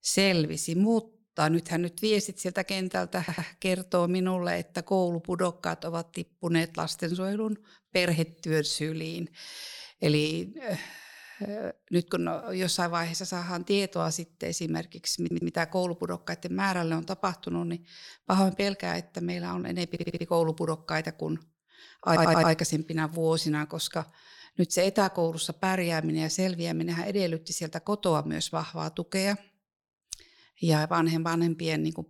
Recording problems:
audio stuttering; 4 times, first at 3 s

